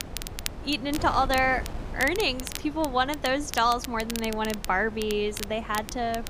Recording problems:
wind noise on the microphone; occasional gusts; 20 dB below the speech
crackle, like an old record; noticeable; 10 dB below the speech

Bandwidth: 15 kHz